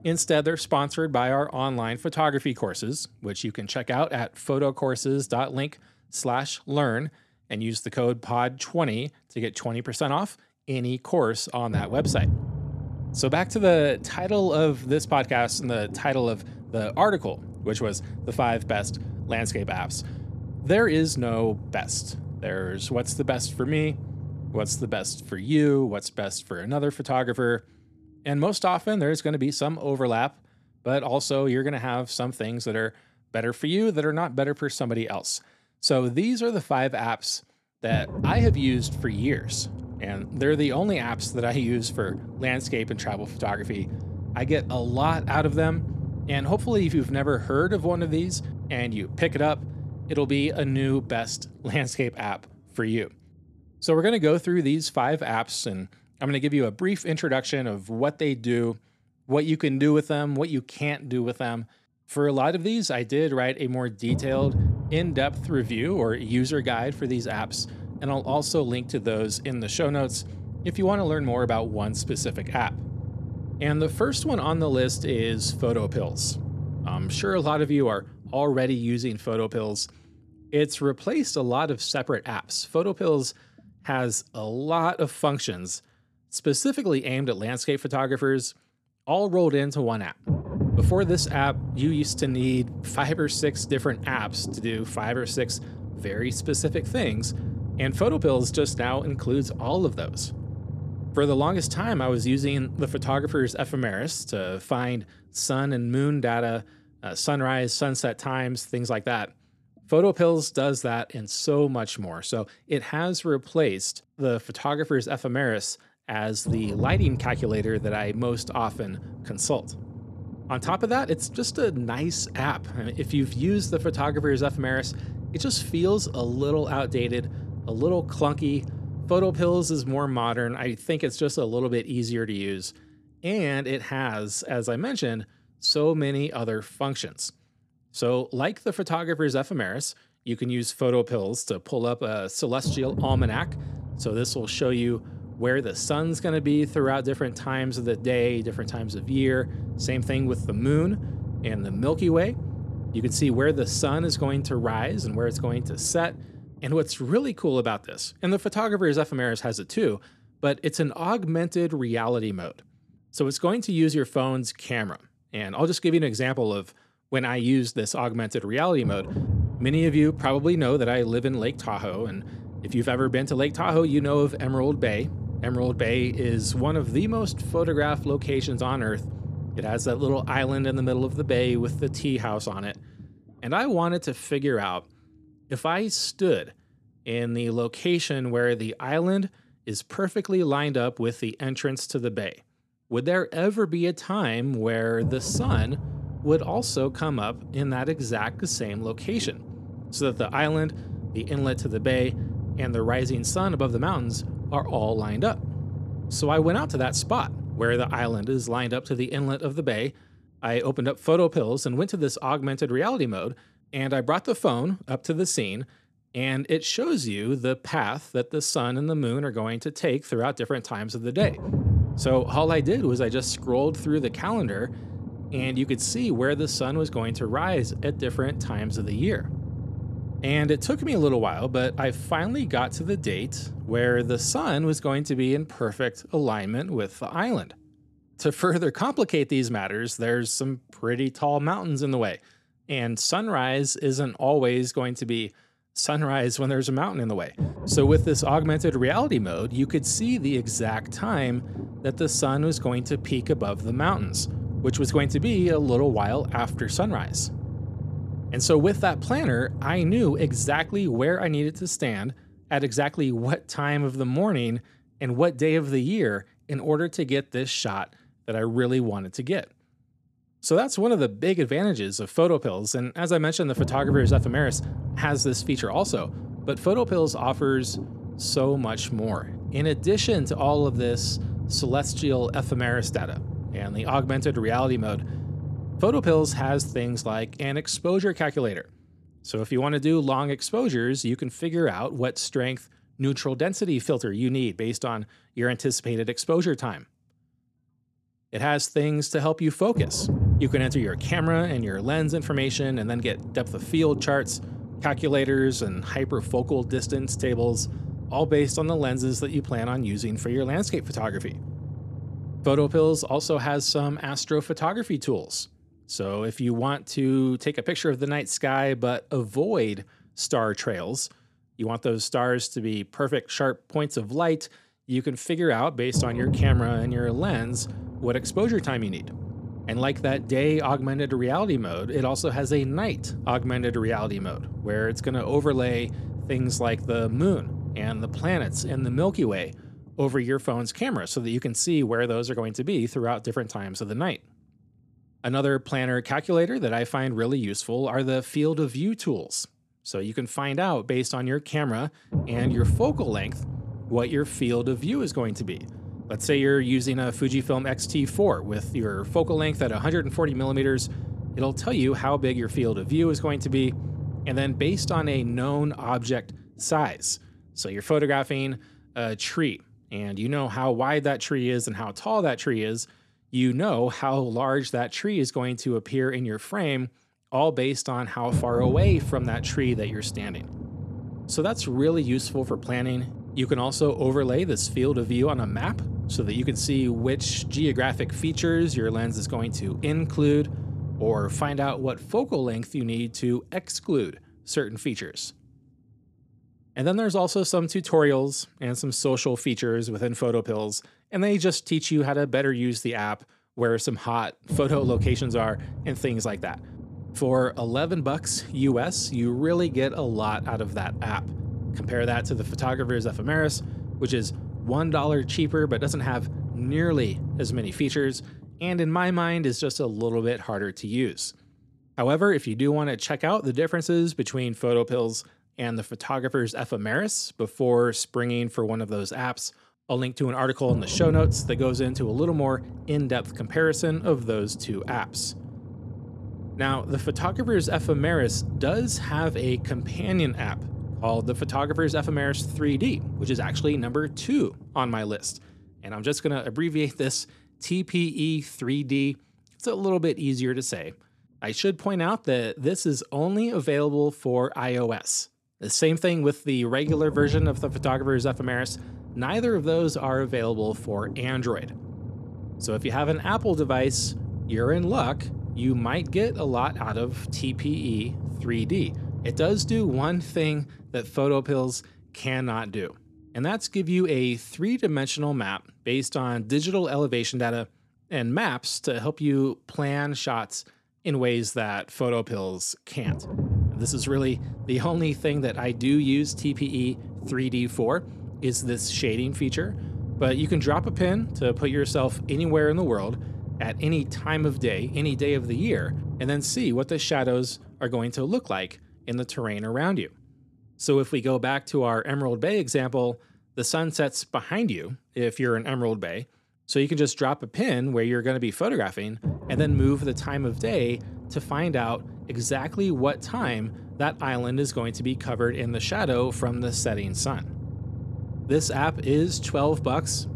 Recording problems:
low rumble; noticeable; throughout; 15 dB below the speech

